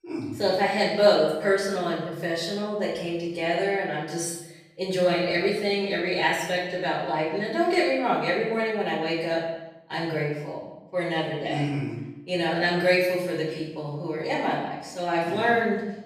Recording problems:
off-mic speech; far
echo of what is said; noticeable; throughout; 160 ms later, 15 dB below the speech
room echo; noticeable; dies away in 0.7 s

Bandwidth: 14.5 kHz